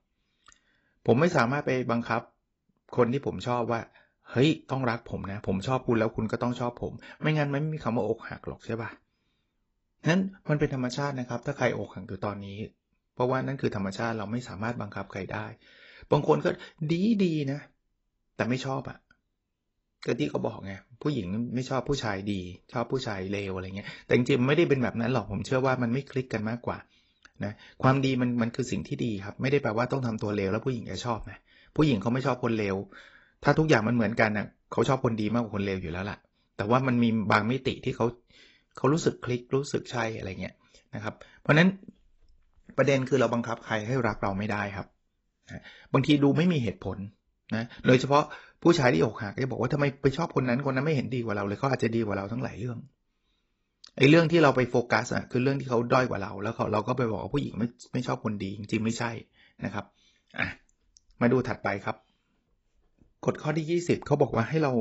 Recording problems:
garbled, watery; badly; nothing above 8 kHz
abrupt cut into speech; at the end

